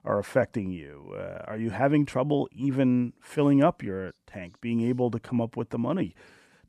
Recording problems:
none

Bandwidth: 14.5 kHz